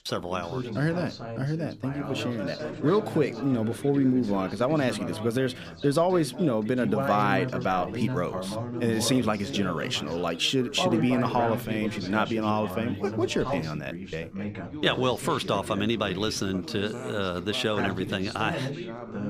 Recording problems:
background chatter; loud; throughout; 3 voices, 7 dB below the speech

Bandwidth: 15 kHz